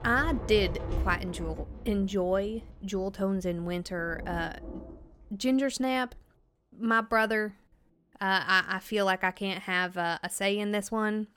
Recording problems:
rain or running water; noticeable; throughout; 10 dB below the speech

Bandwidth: 18 kHz